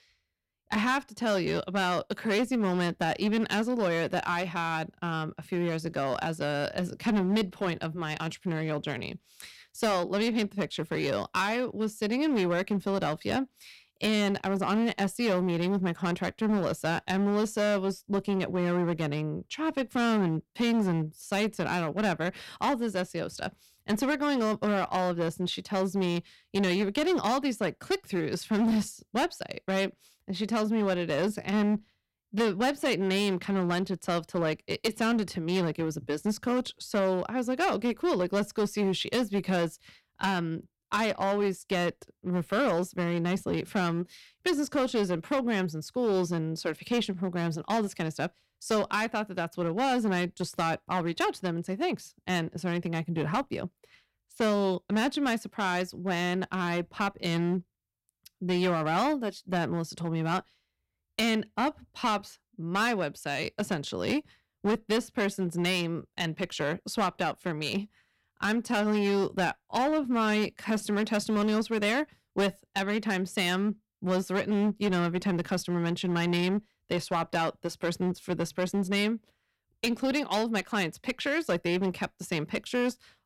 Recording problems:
distortion; slight; 8% of the sound clipped

